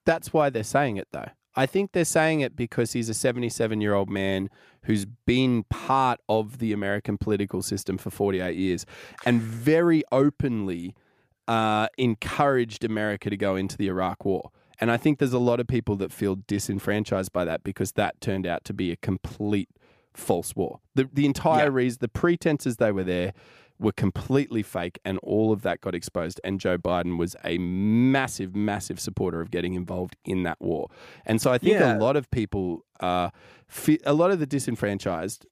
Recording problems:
none

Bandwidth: 15 kHz